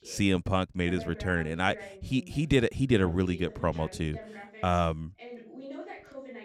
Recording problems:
voice in the background; noticeable; throughout; 15 dB below the speech

